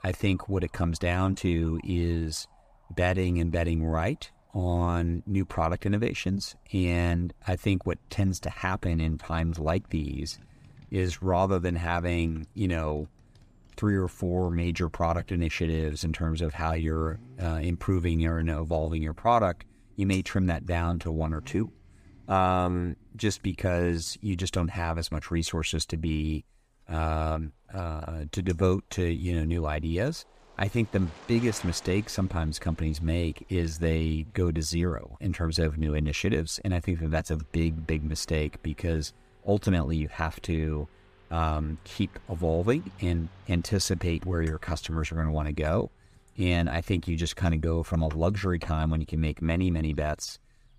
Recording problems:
traffic noise; faint; throughout; 25 dB below the speech

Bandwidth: 15 kHz